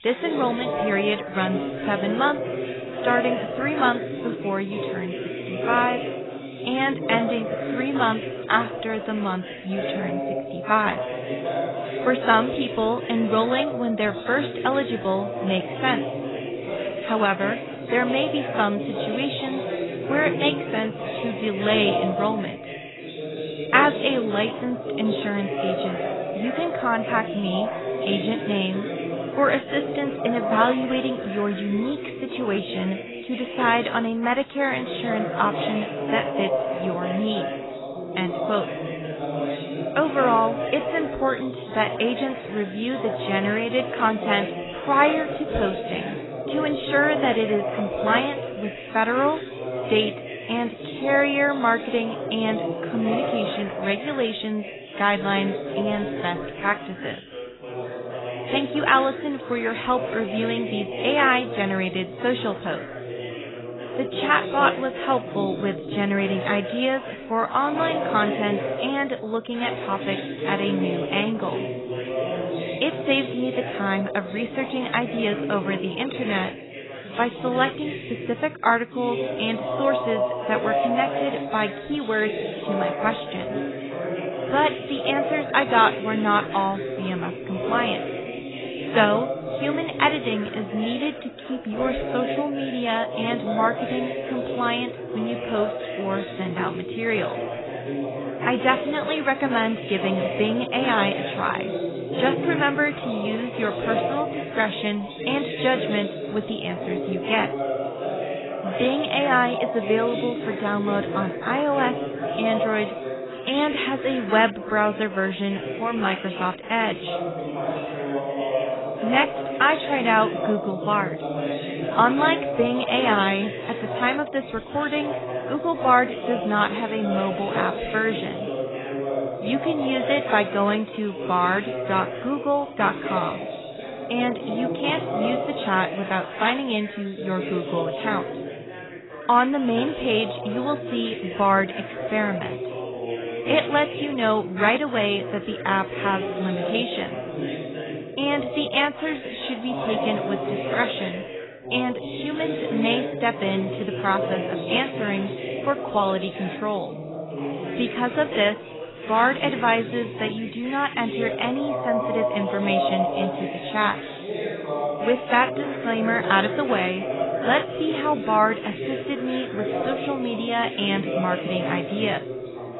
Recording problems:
garbled, watery; badly; nothing above 4 kHz
background chatter; loud; throughout; 2 voices, 5 dB below the speech

